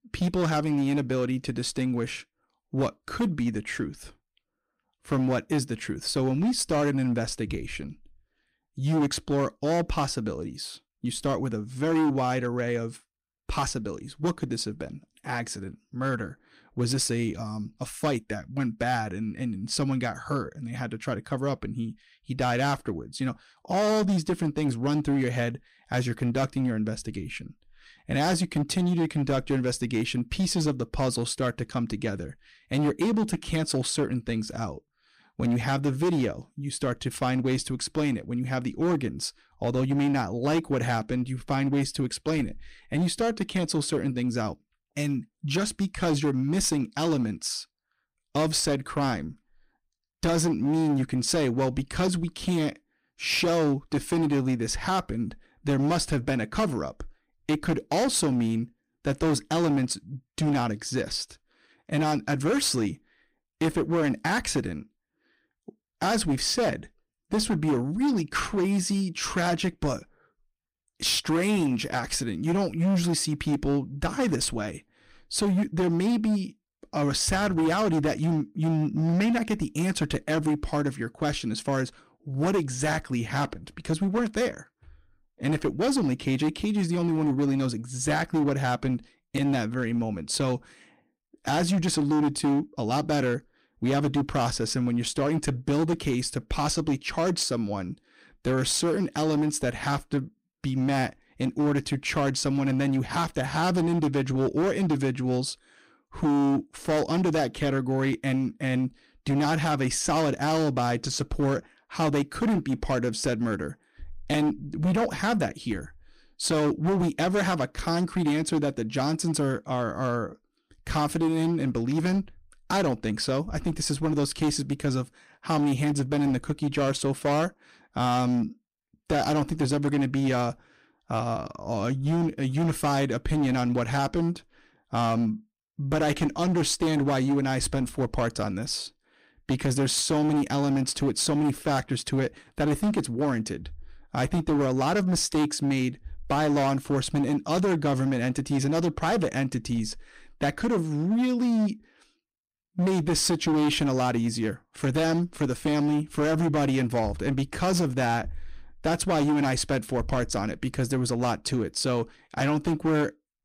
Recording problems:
distortion; slight; 11% of the sound clipped

